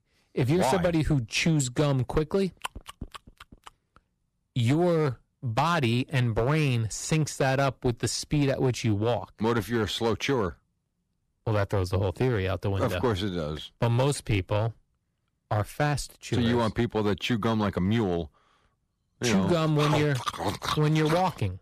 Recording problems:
distortion; slight; 5% of the sound clipped

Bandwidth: 14.5 kHz